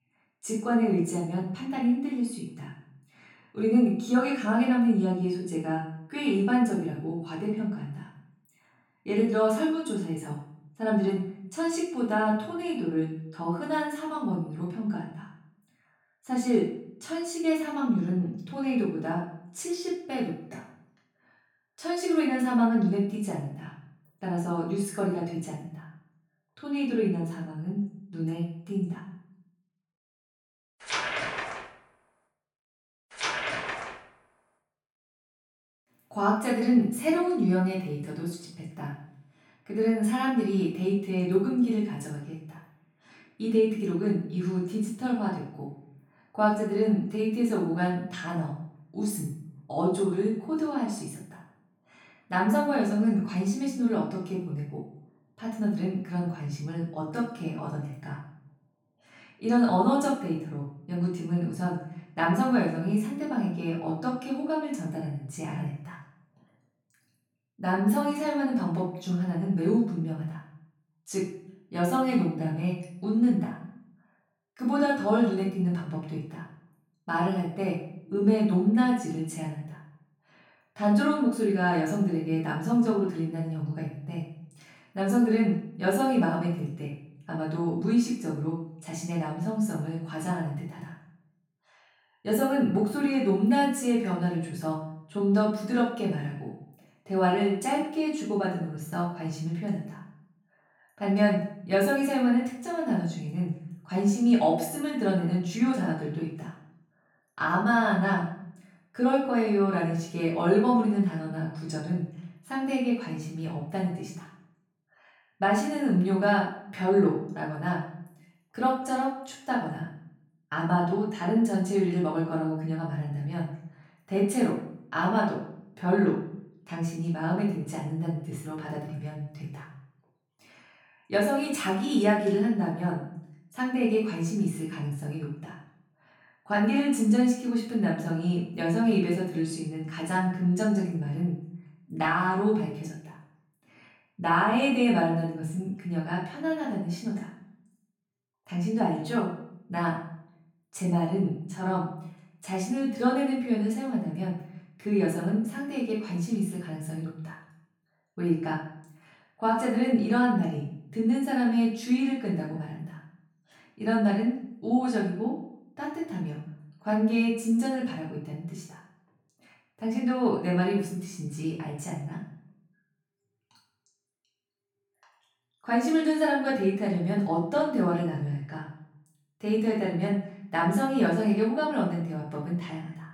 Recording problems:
off-mic speech; far
room echo; noticeable; dies away in 0.6 s

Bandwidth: 17.5 kHz